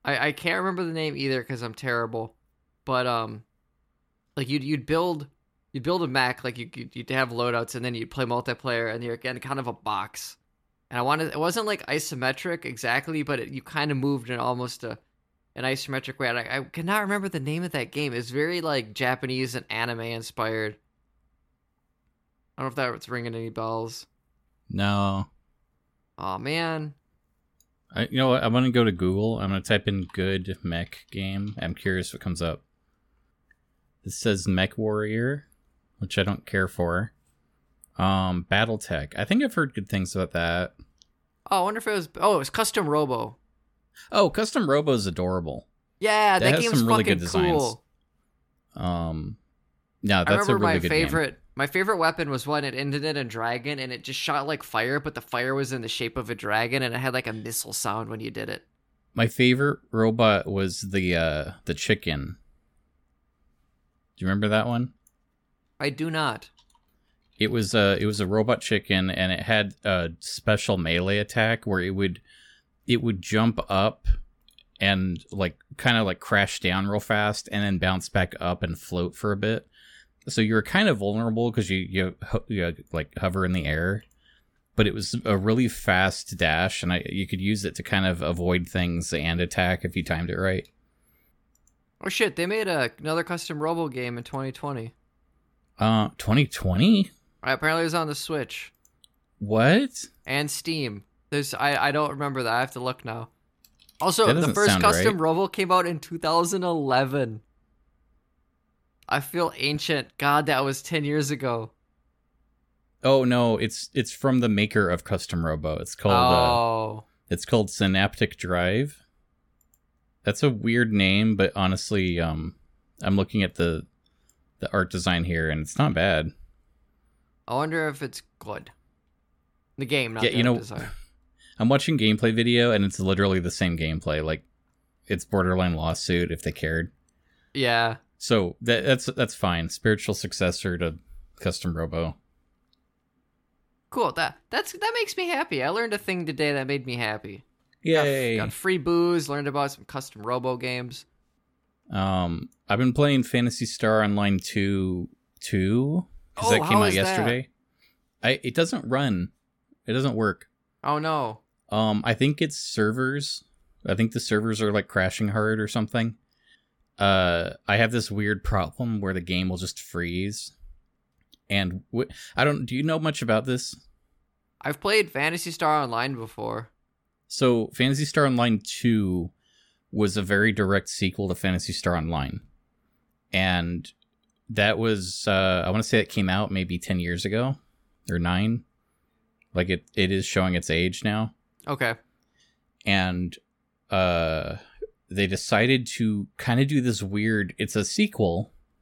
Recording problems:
none

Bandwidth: 17 kHz